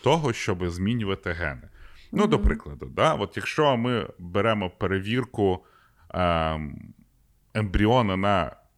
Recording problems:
none

